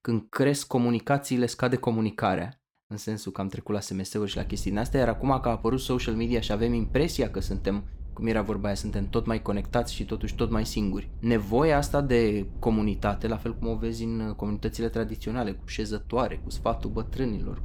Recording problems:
low rumble; faint; from 4.5 s on; 25 dB below the speech

